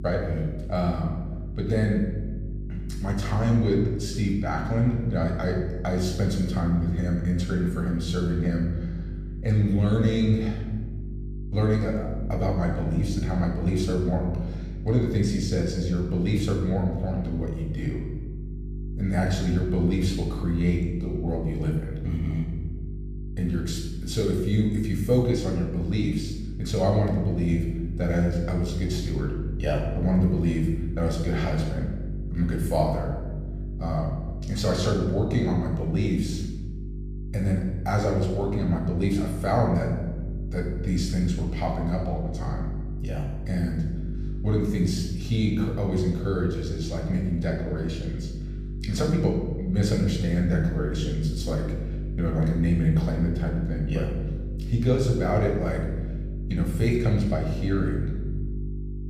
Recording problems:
room echo; noticeable; dies away in 1.1 s
off-mic speech; somewhat distant
electrical hum; noticeable; throughout; 50 Hz, 15 dB below the speech

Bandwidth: 14.5 kHz